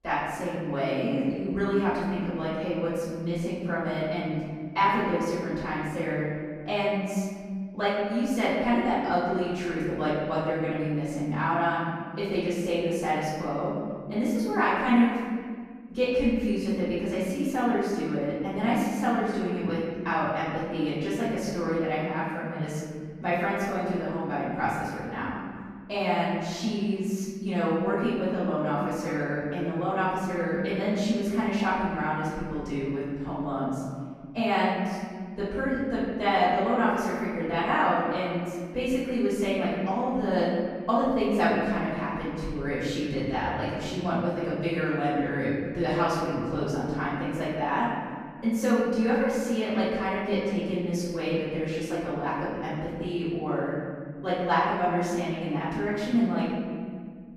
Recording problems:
room echo; strong; dies away in 1.9 s
off-mic speech; far

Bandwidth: 14.5 kHz